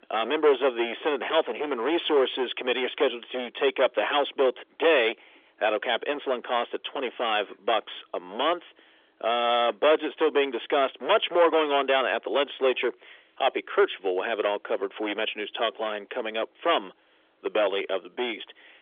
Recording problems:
distortion; heavy; 9% of the sound clipped
phone-call audio; nothing above 3.5 kHz

